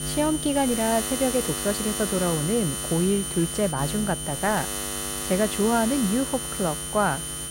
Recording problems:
electrical hum; loud; throughout; 60 Hz, 7 dB below the speech
high-pitched whine; loud; throughout; 9 kHz, 5 dB below the speech

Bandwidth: 16 kHz